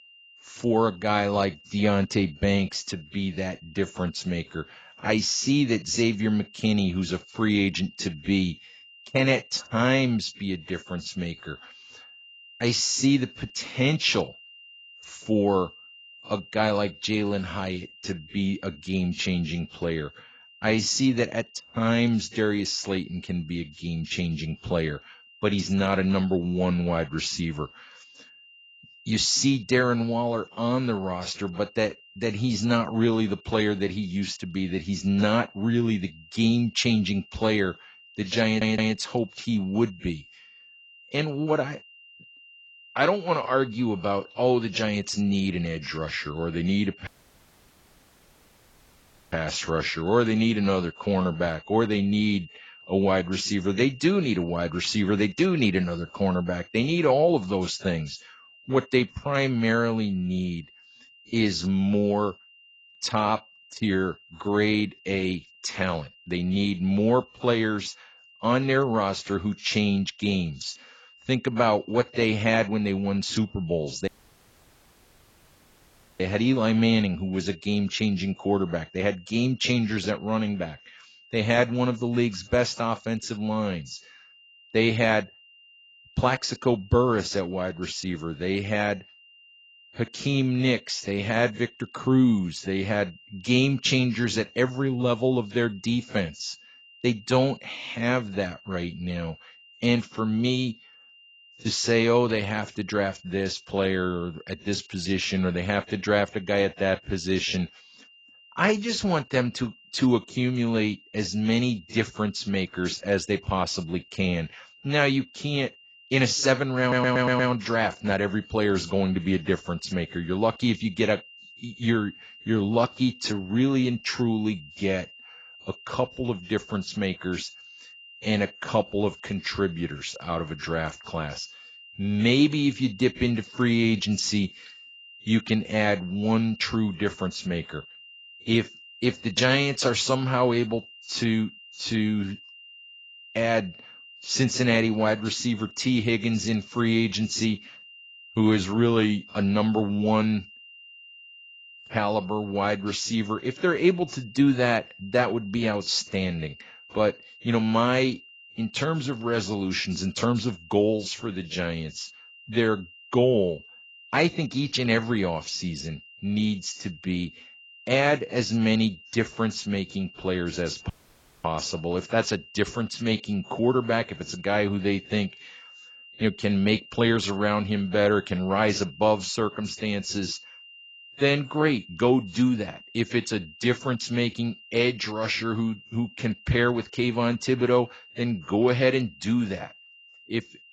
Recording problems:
garbled, watery; badly; nothing above 7.5 kHz
high-pitched whine; faint; throughout; 3 kHz, 20 dB below the speech
audio stuttering; at 38 s and at 1:57
audio cutting out; at 47 s for 2.5 s, at 1:14 for 2 s and at 2:51 for 0.5 s

